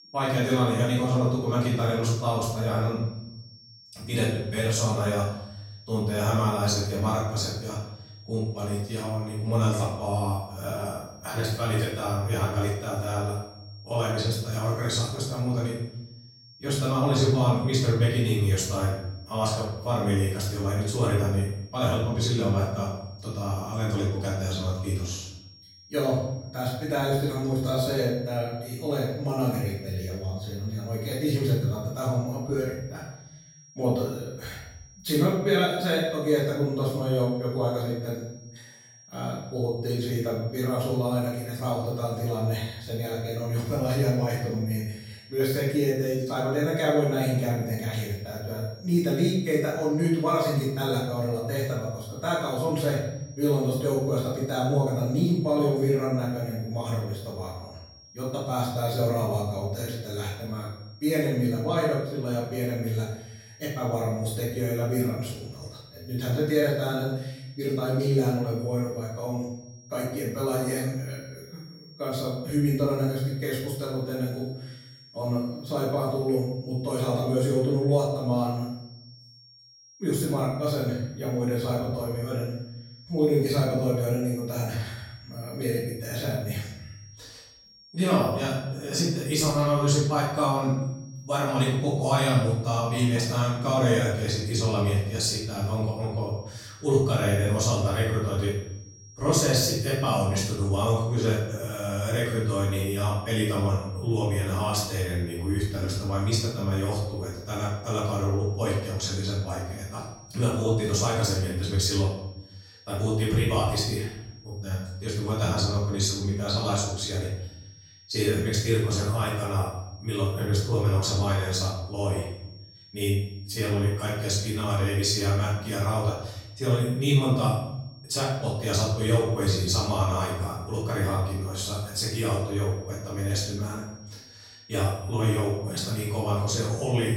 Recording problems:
off-mic speech; far
room echo; noticeable; dies away in 0.9 s
high-pitched whine; faint; throughout; 5.5 kHz, 25 dB below the speech

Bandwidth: 16 kHz